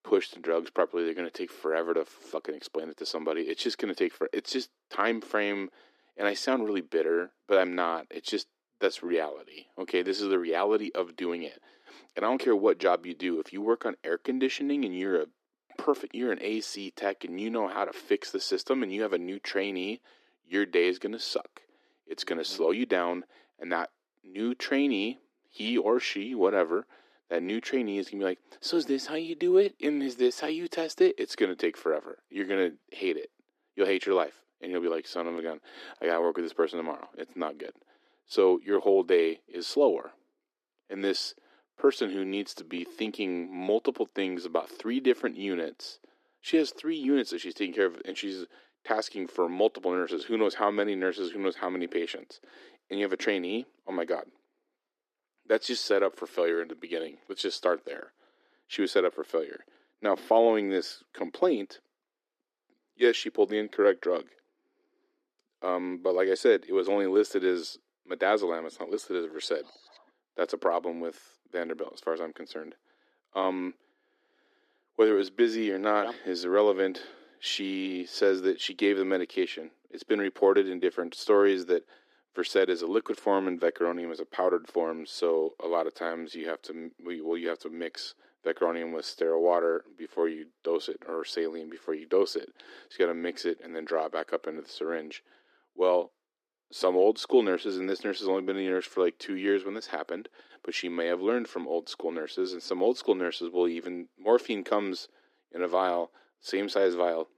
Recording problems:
thin; somewhat; fading below 300 Hz
muffled; very slightly; fading above 3.5 kHz

